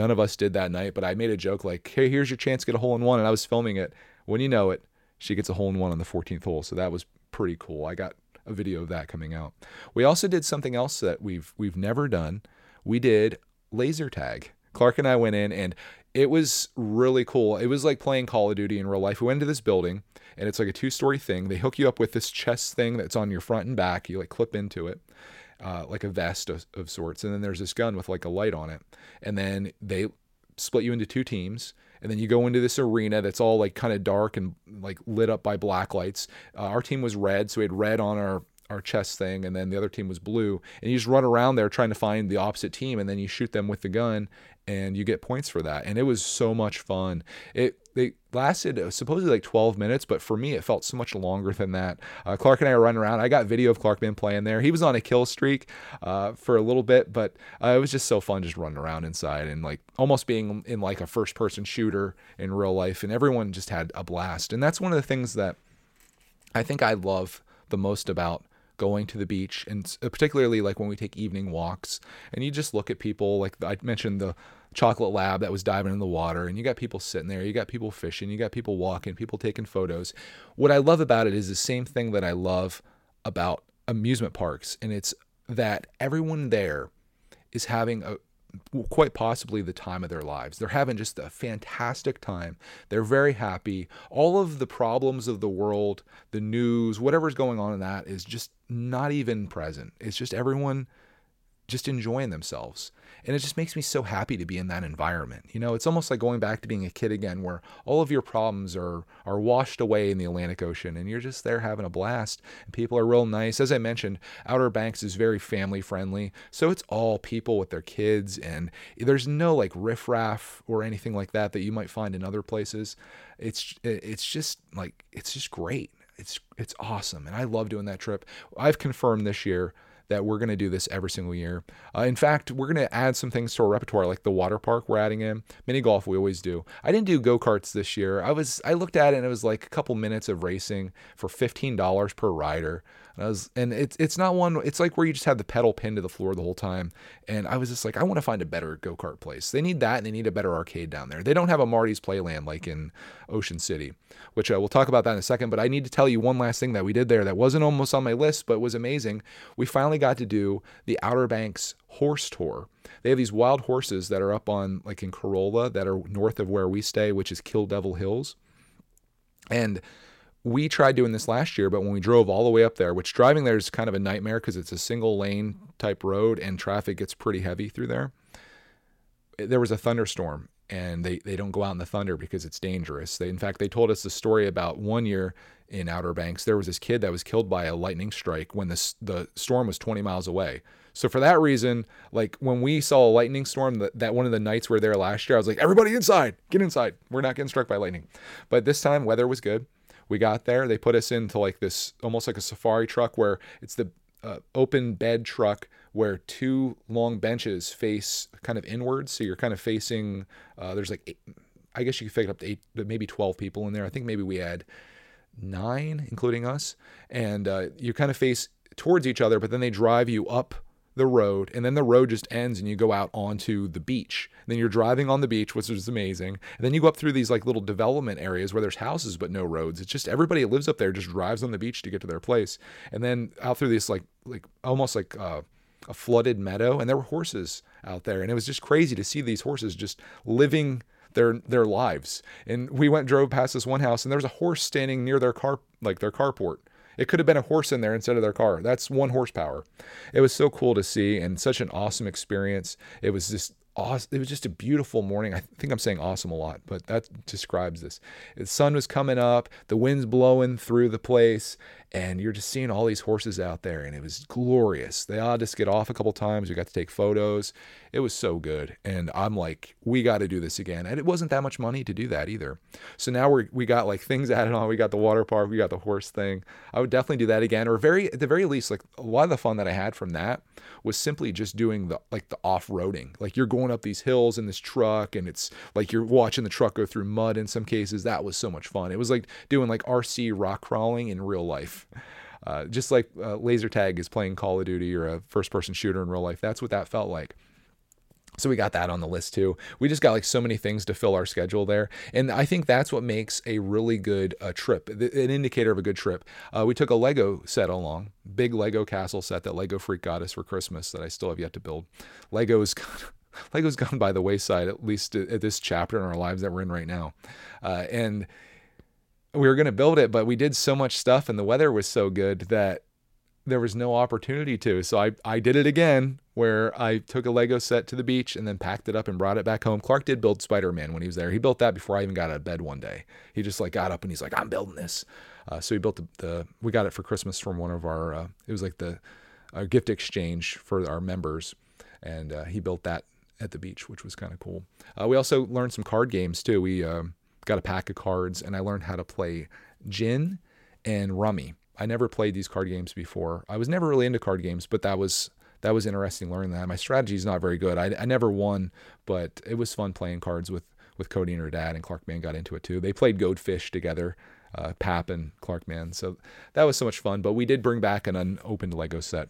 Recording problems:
abrupt cut into speech; at the start

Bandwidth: 16.5 kHz